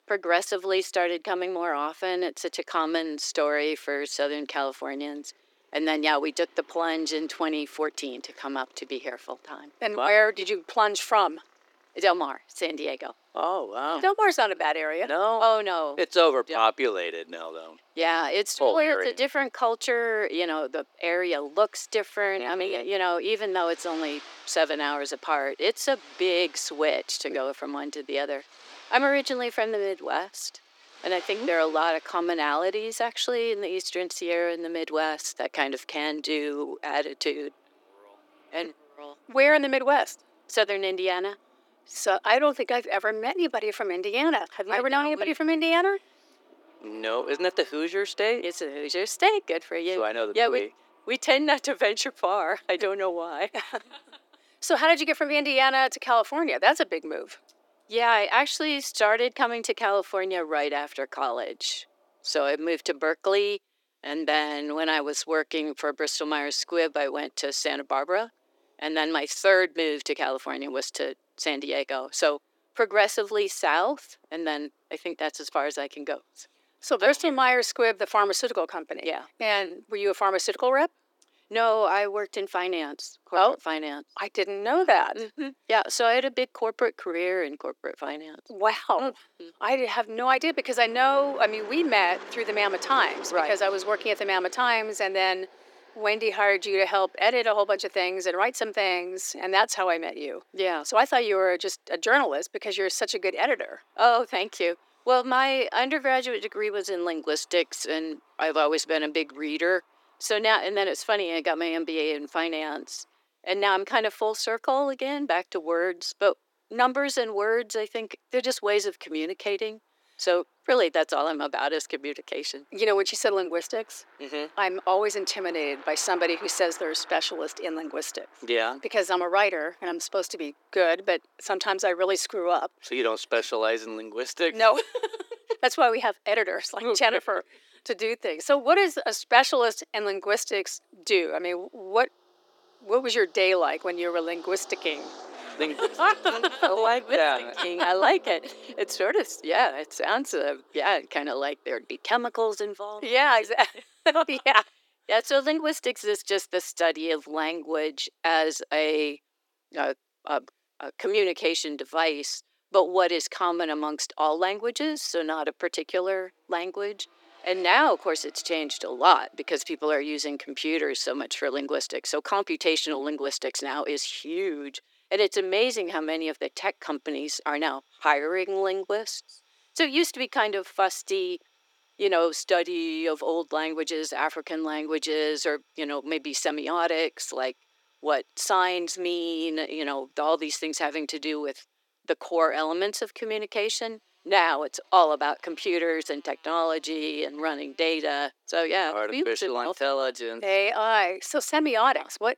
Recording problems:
thin; somewhat; fading below 350 Hz
traffic noise; faint; throughout; 25 dB below the speech

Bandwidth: 17 kHz